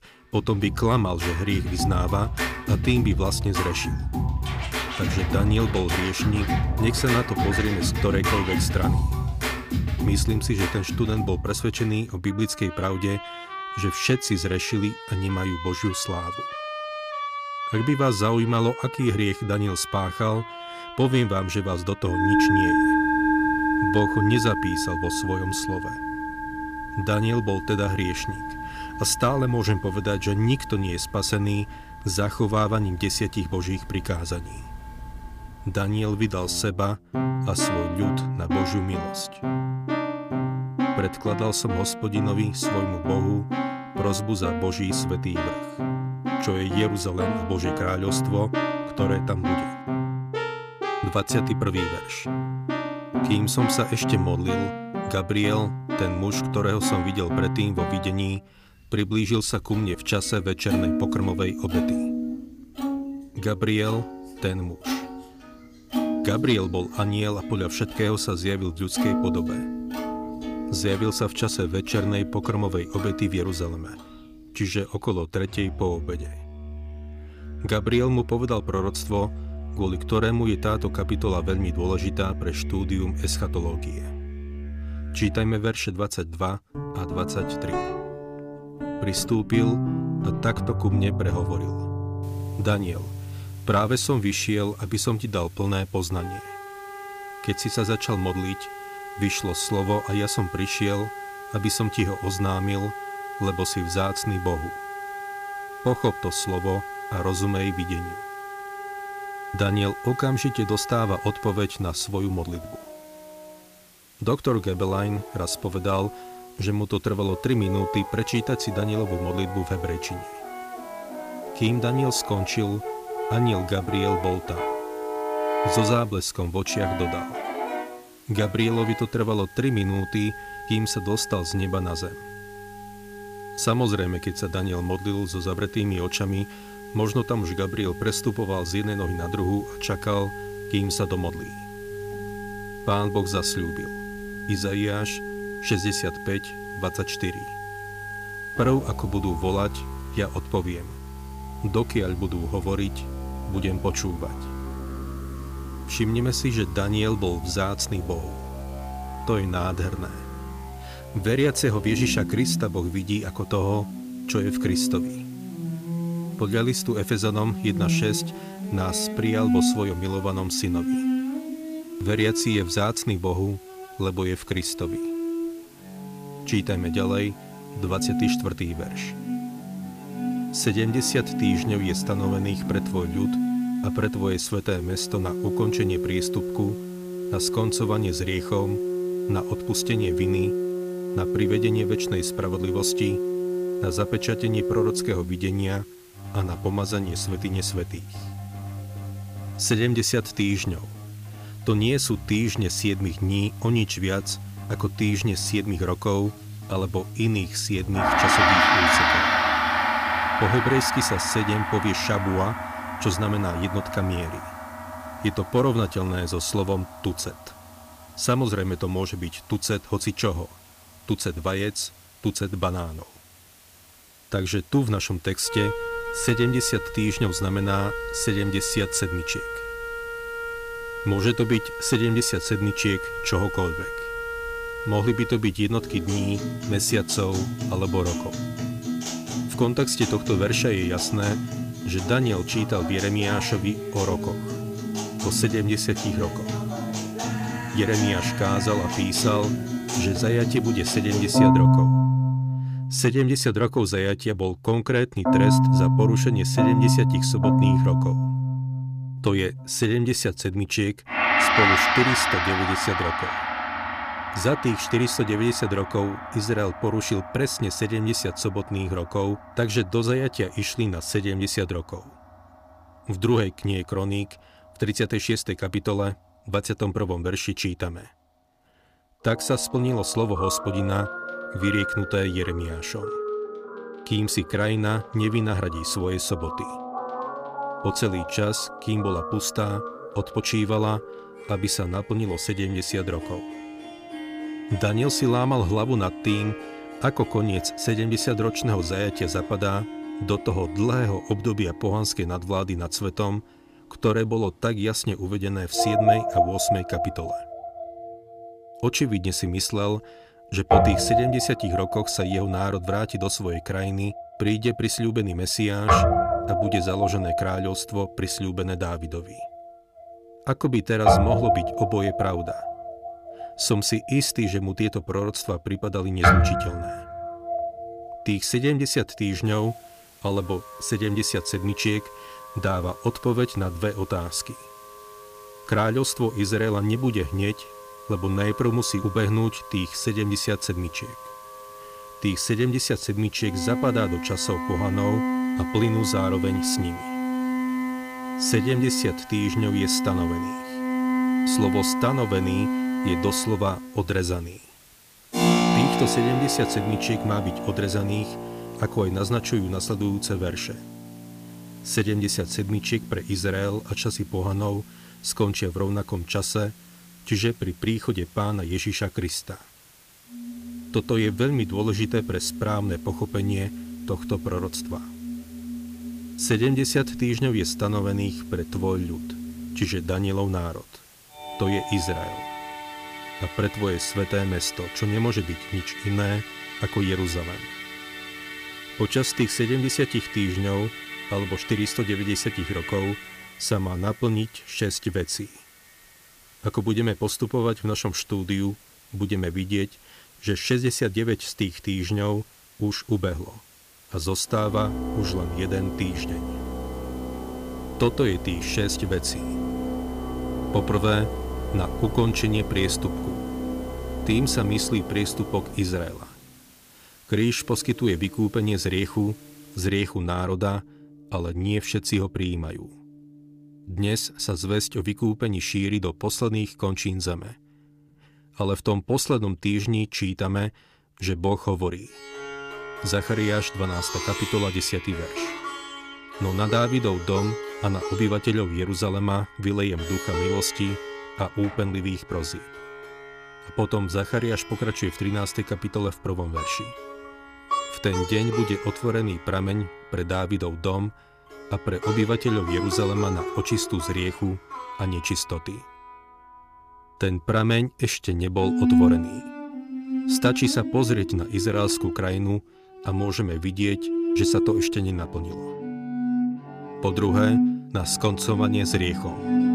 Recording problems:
background music; loud; throughout; 3 dB below the speech
hiss; faint; from 1:32 to 4:11 and from 5:29 to 7:00; 25 dB below the speech

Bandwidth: 15 kHz